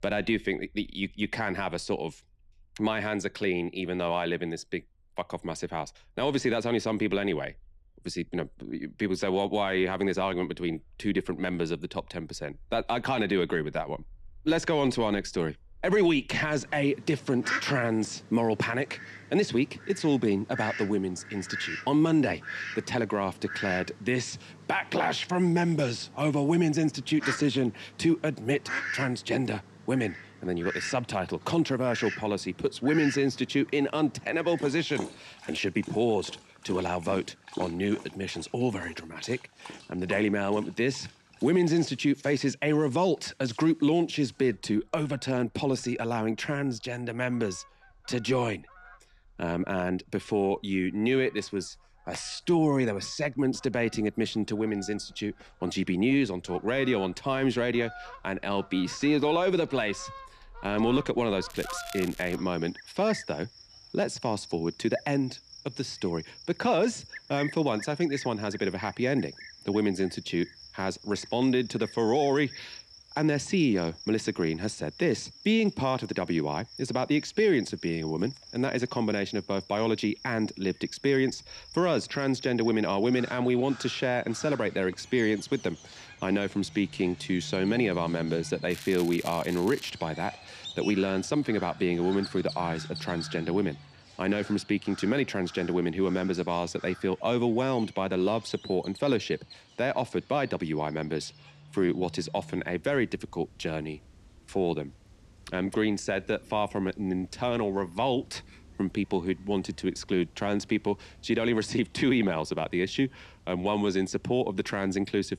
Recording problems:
animal sounds; noticeable; throughout; 15 dB below the speech
crackling; noticeable; at 1:01 and from 1:29 to 1:30; 15 dB below the speech

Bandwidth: 14.5 kHz